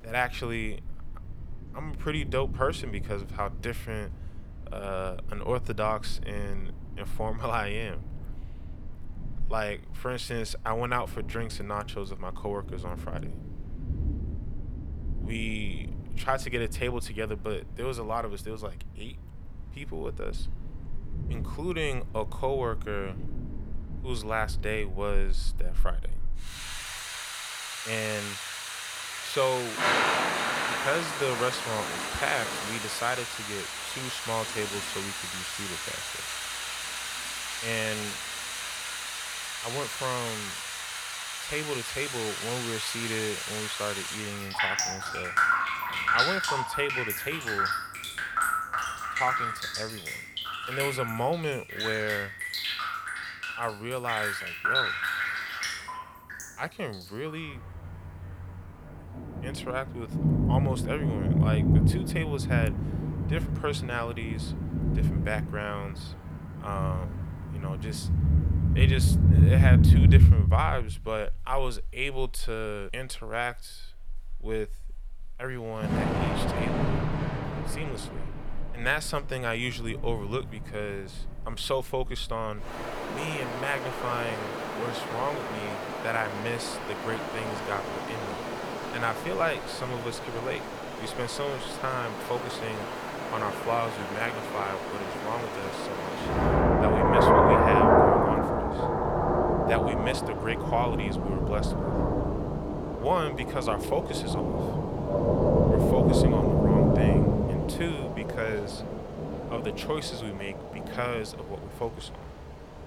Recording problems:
rain or running water; very loud; throughout; 5 dB above the speech

